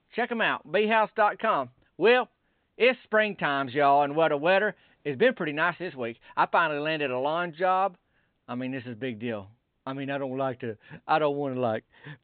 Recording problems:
high frequencies cut off; severe; nothing above 4 kHz

